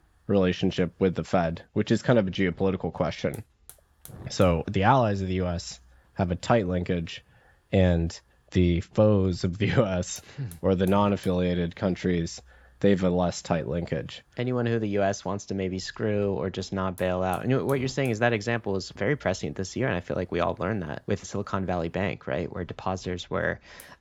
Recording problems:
high frequencies cut off; noticeable; nothing above 8 kHz
hiss; faint; throughout; 25 dB below the speech

